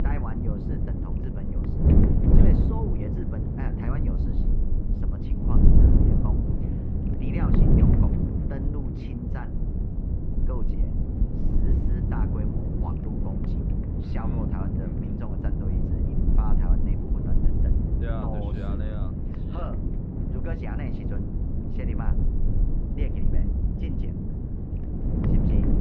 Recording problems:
muffled; very; fading above 2.5 kHz
wind noise on the microphone; heavy; 5 dB above the speech

